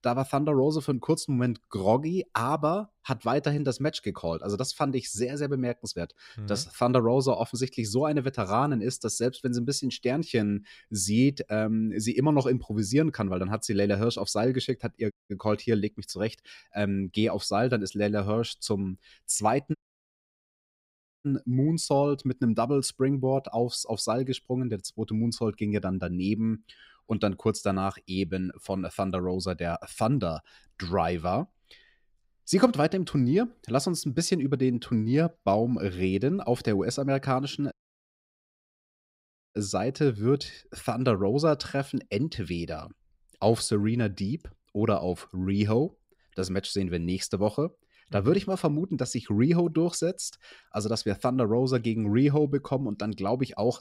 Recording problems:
audio cutting out; at 15 s, at 20 s for 1.5 s and at 38 s for 2 s

